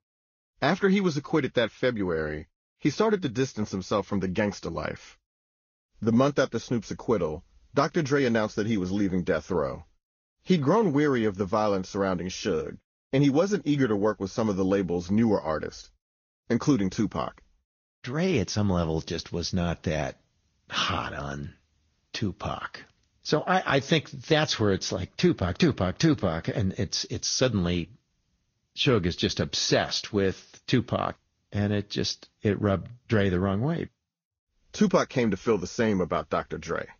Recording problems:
high frequencies cut off; noticeable; nothing above 6.5 kHz
garbled, watery; slightly

